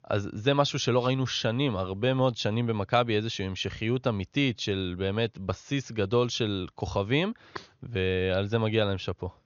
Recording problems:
high frequencies cut off; noticeable; nothing above 6.5 kHz

